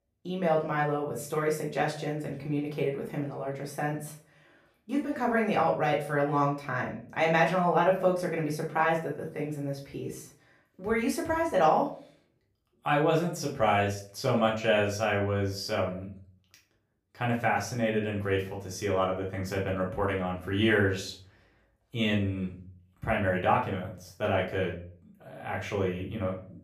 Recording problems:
off-mic speech; far
room echo; slight; dies away in 0.4 s

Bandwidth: 15 kHz